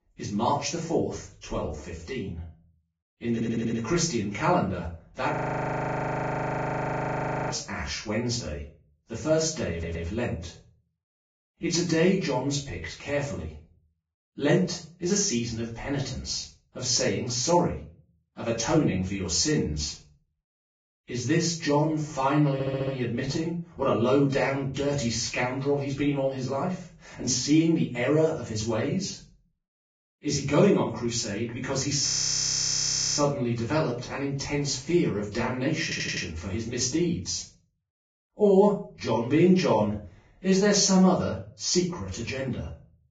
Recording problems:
off-mic speech; far
garbled, watery; badly
room echo; slight; dies away in 0.4 s
audio stuttering; 4 times, first at 3.5 s
audio freezing; at 5.5 s for 2 s and at 32 s for 1 s

